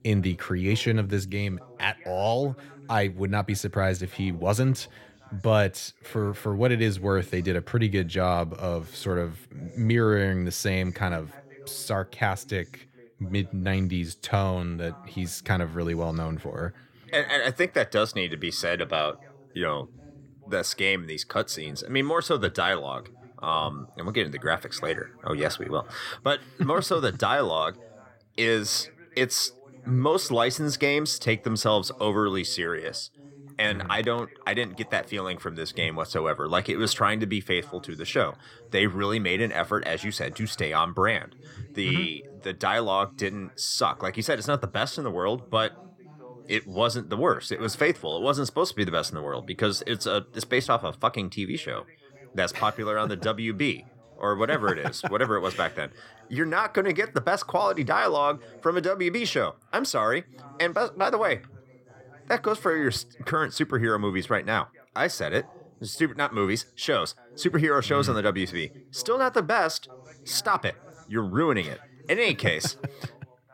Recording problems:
background chatter; faint; throughout; 2 voices, 25 dB below the speech

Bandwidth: 16.5 kHz